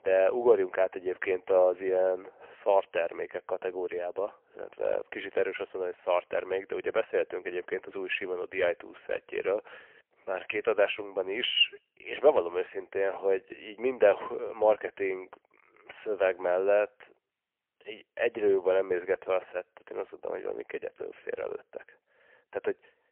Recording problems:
phone-call audio; poor line; nothing above 3 kHz

